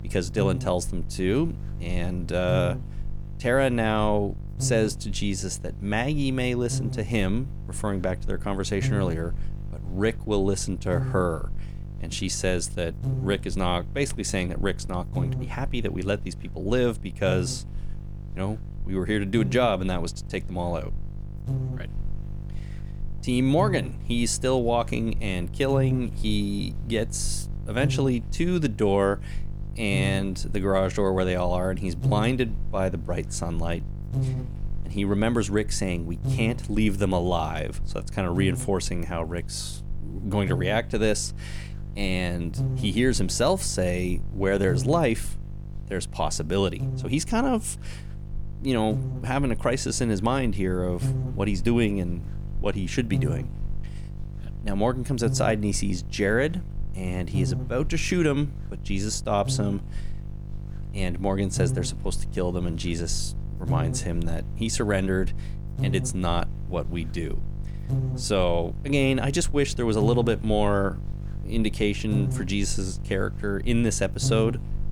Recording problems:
electrical hum; noticeable; throughout; 50 Hz, 15 dB below the speech

